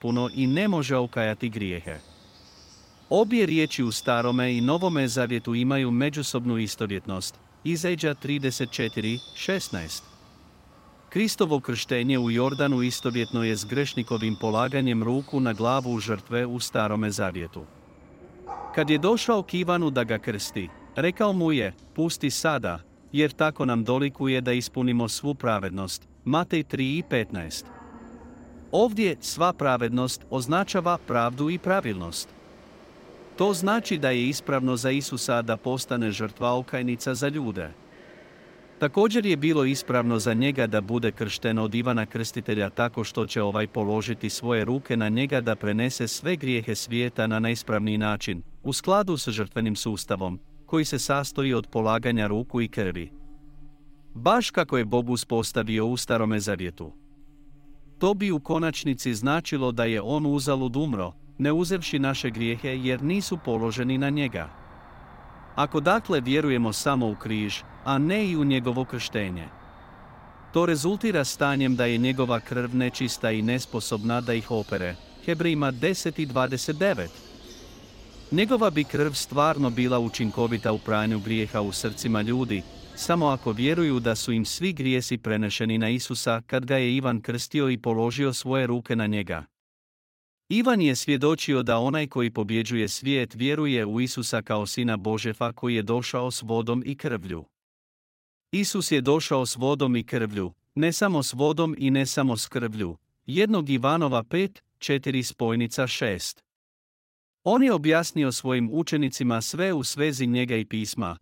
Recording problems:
animal sounds; faint; until 1:24; 20 dB below the speech

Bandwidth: 16 kHz